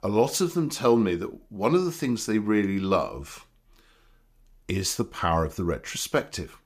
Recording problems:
none

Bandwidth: 15 kHz